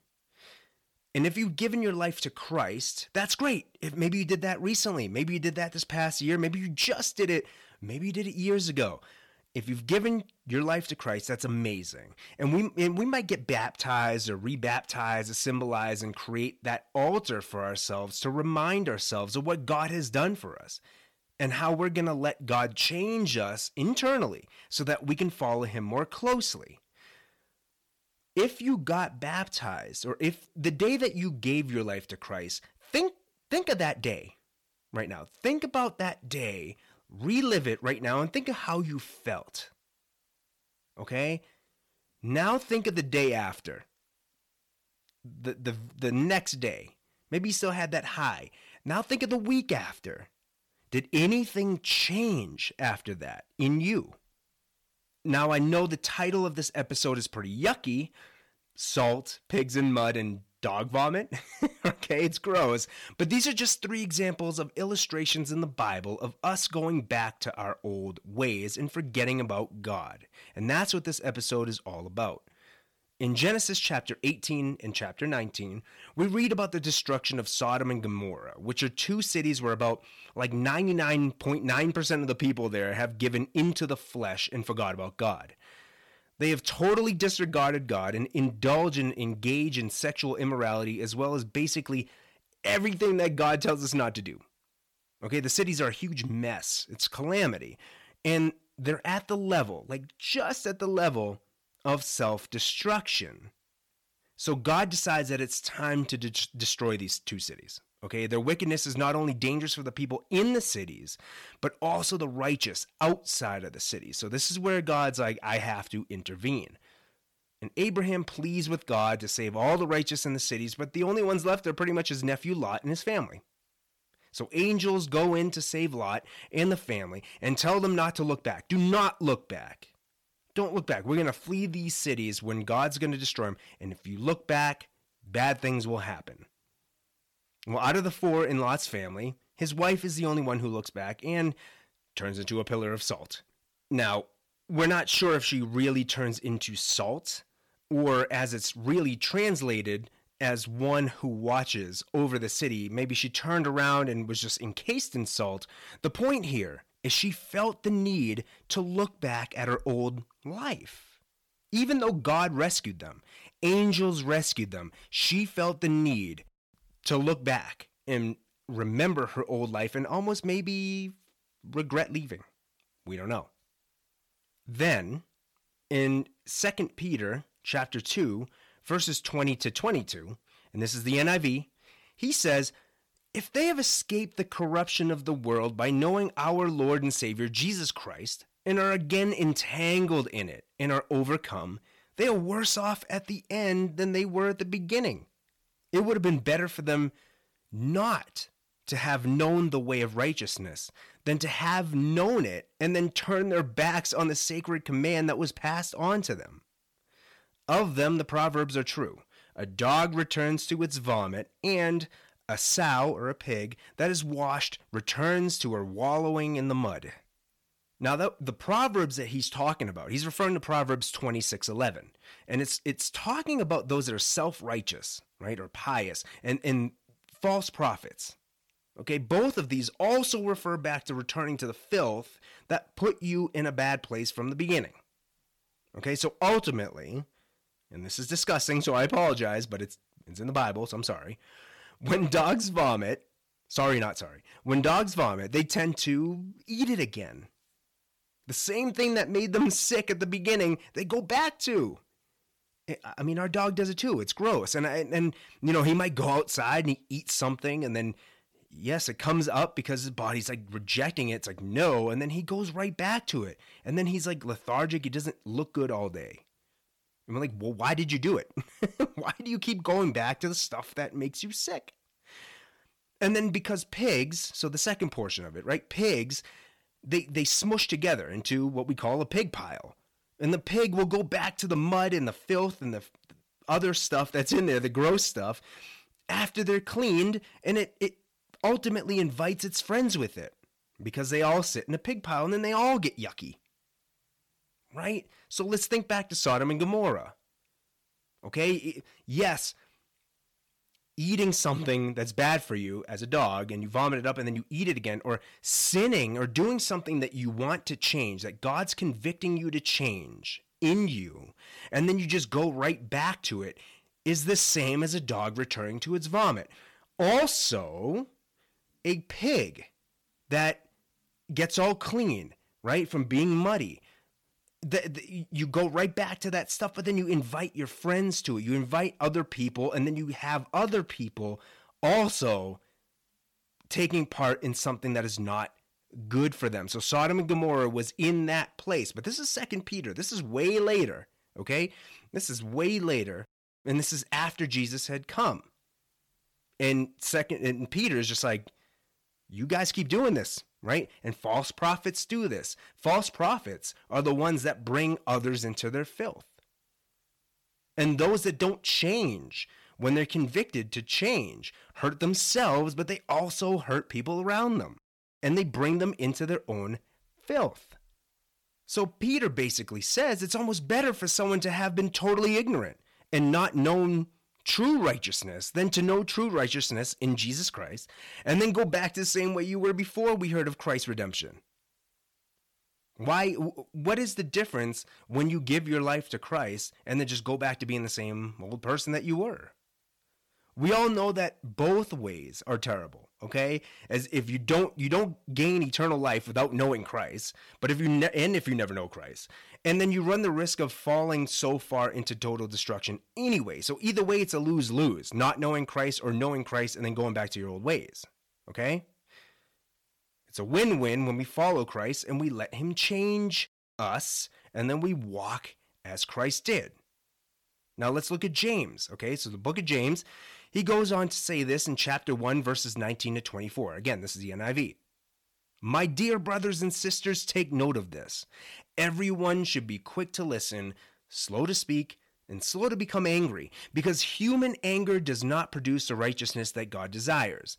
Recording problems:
distortion; slight; 3% of the sound clipped

